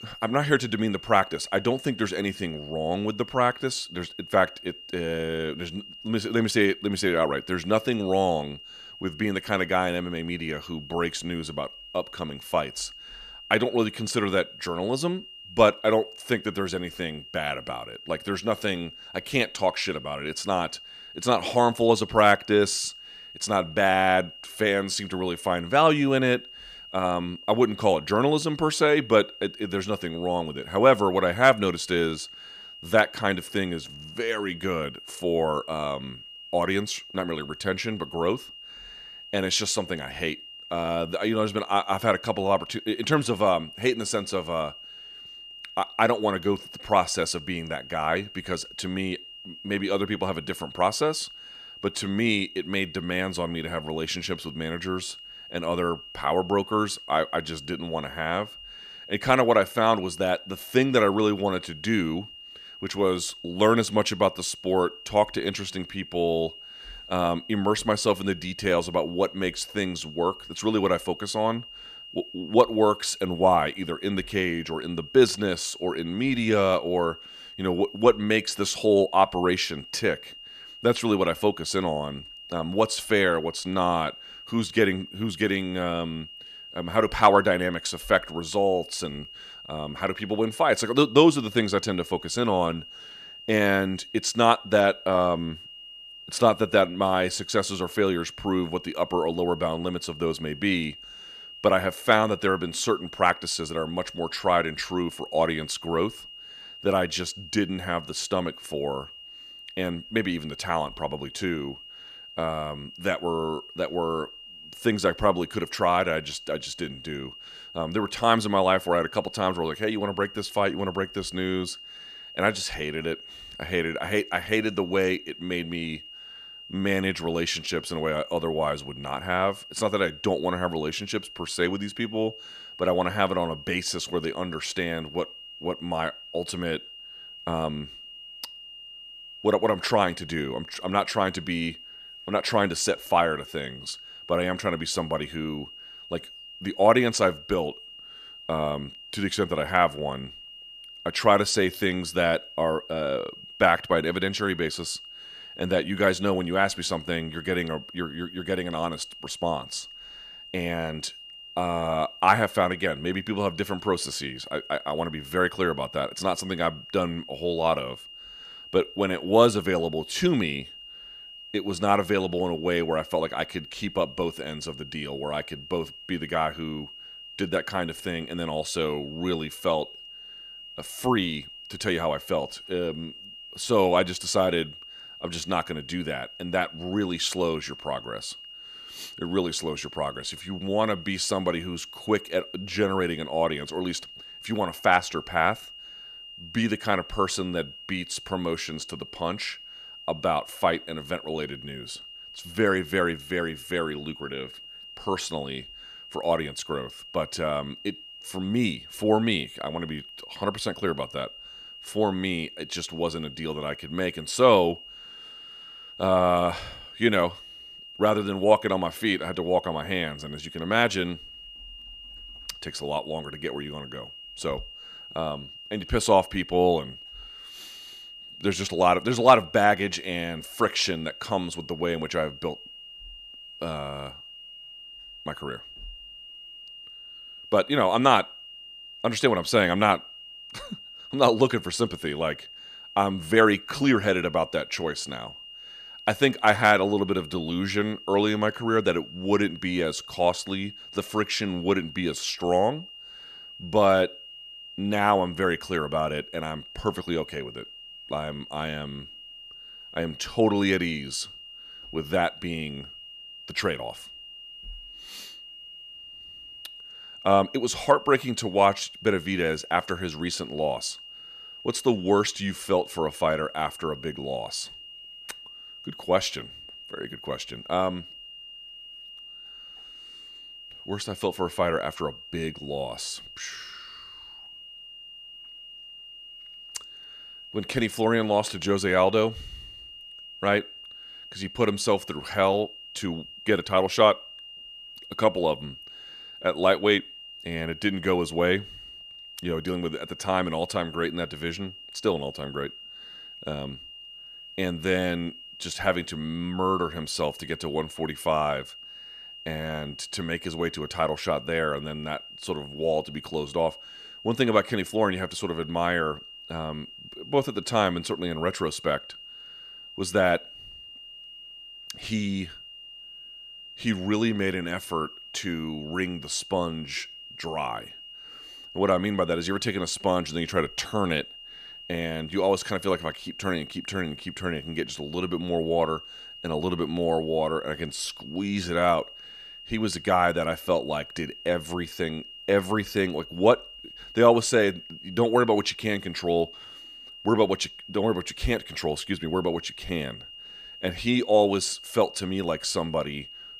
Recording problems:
high-pitched whine; noticeable; throughout; 3 kHz, 15 dB below the speech

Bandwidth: 15 kHz